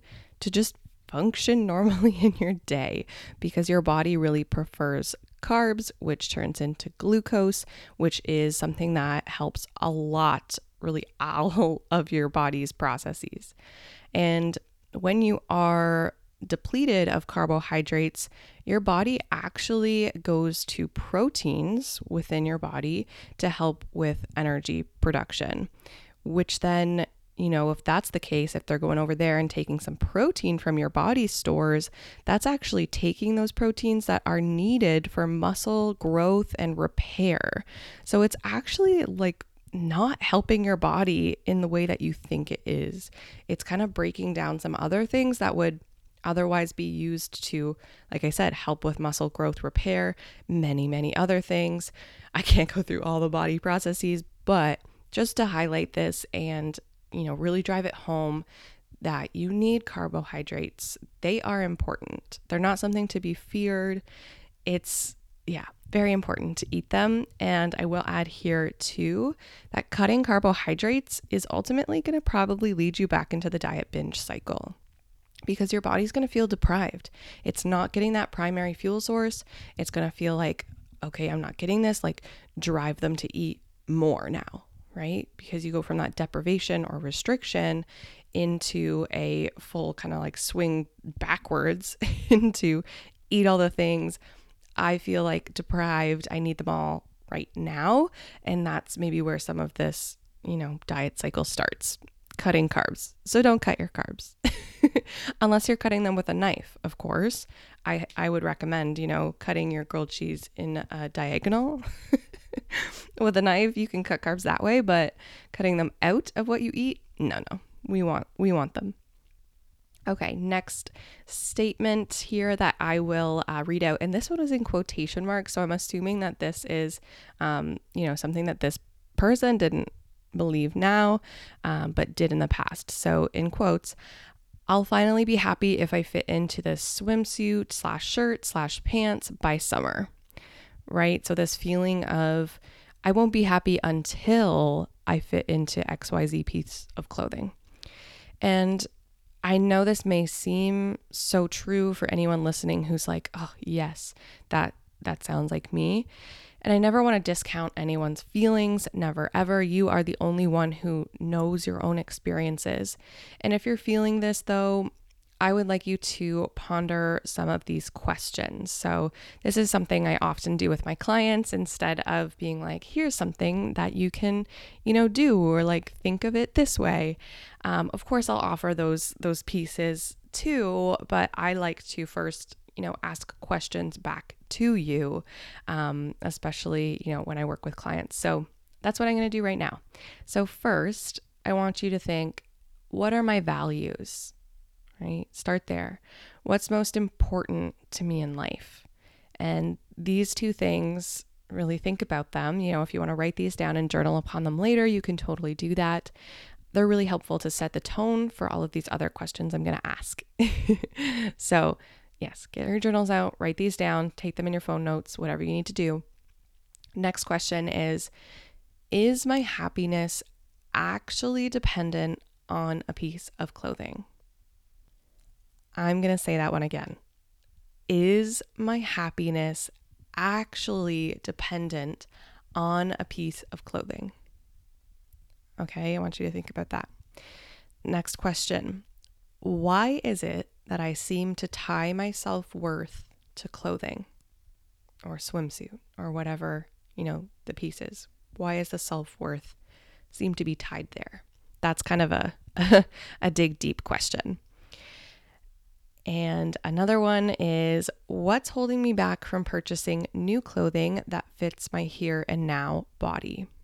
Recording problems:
none

